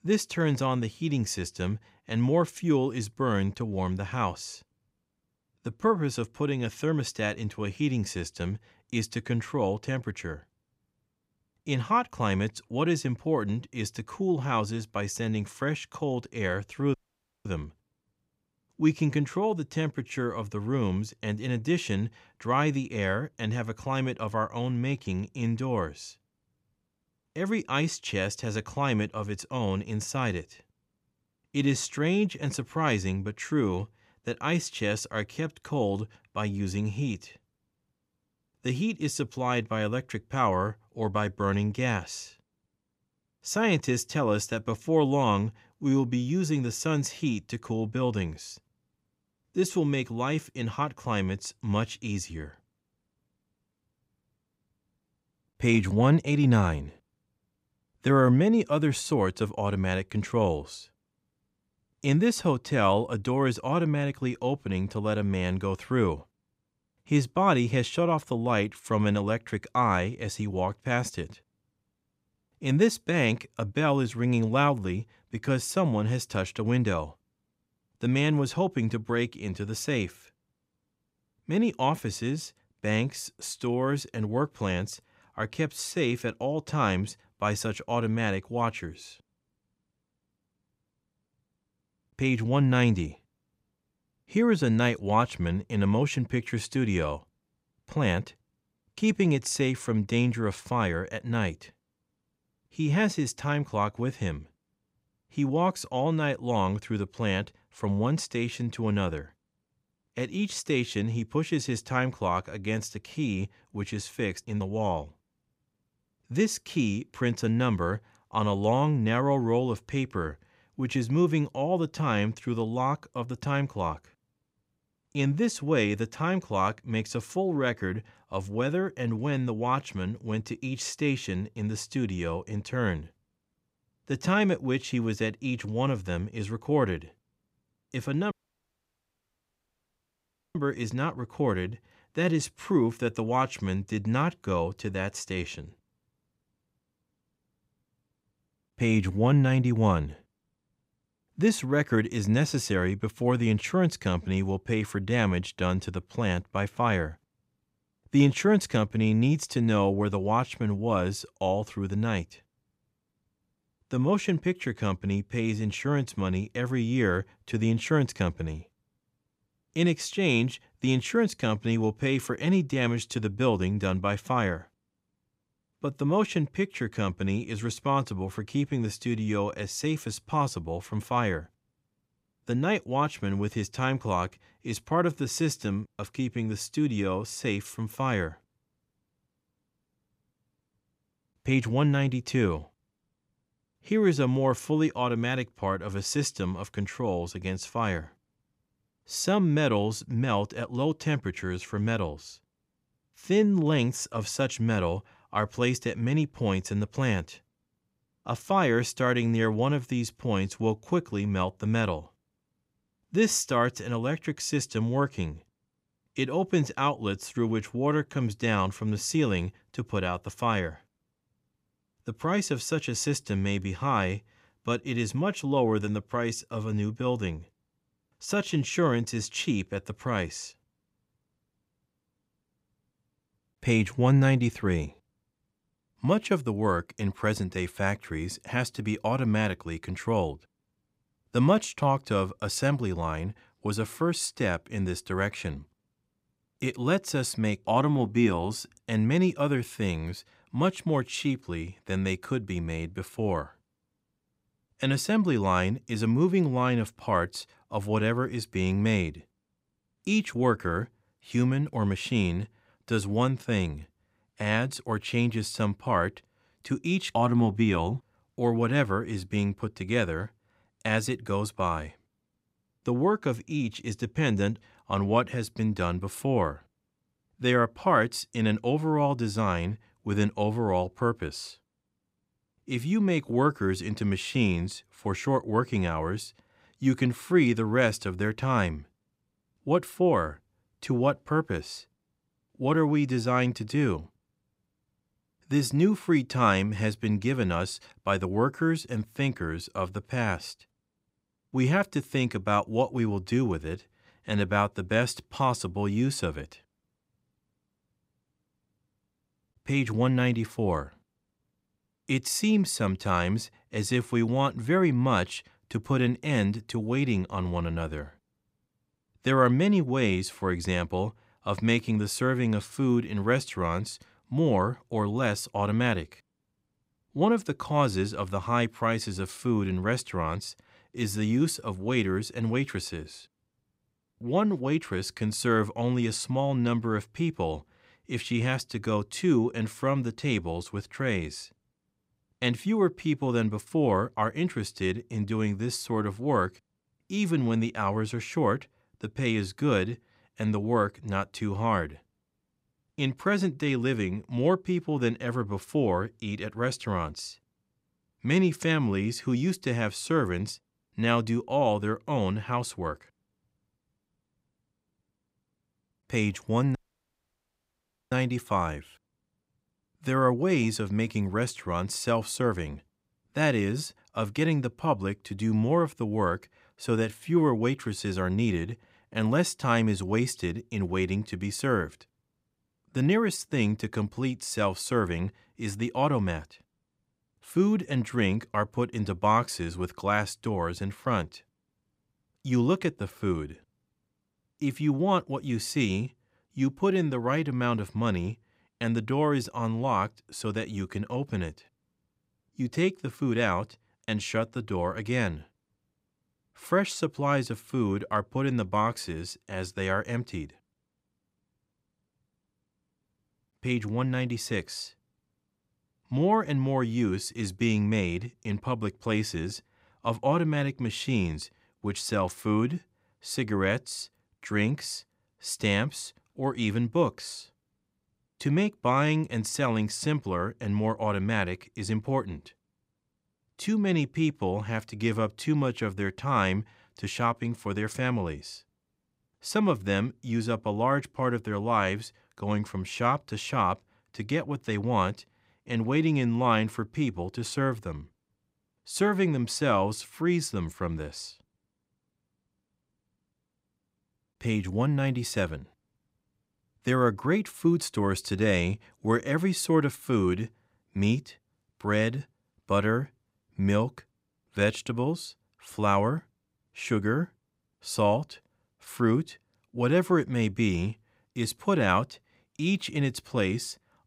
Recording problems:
audio cutting out; at 17 s for 0.5 s, at 2:18 for 2 s and at 6:07 for 1.5 s

